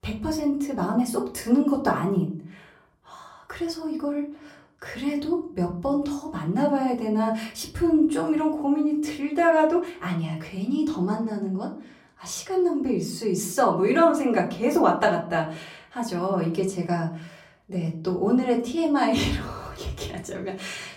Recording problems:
off-mic speech; far
room echo; very slight; dies away in 0.4 s

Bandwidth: 16 kHz